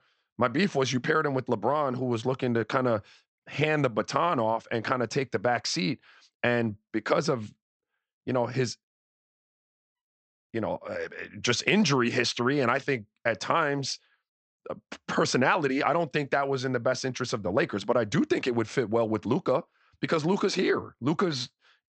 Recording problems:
high frequencies cut off; noticeable; nothing above 8 kHz

